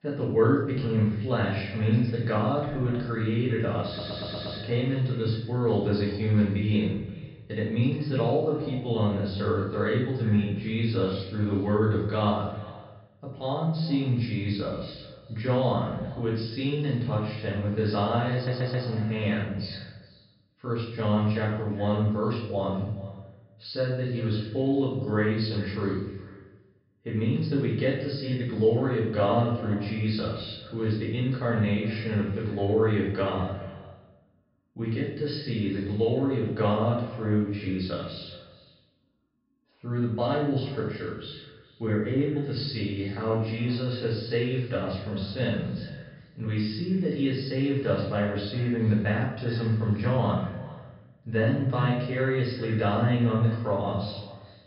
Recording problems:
off-mic speech; far
room echo; noticeable; dies away in 0.8 s
high frequencies cut off; noticeable; nothing above 5.5 kHz
echo of what is said; faint; throughout; 400 ms later, 20 dB below the speech
audio stuttering; at 4 s and at 18 s

